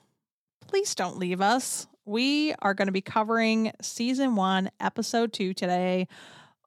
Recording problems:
none

